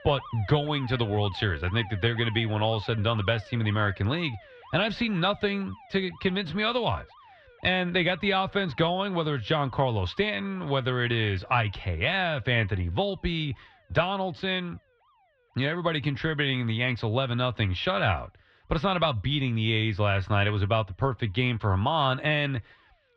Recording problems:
muffled; very slightly; fading above 3.5 kHz
alarms or sirens; faint; throughout; 20 dB below the speech

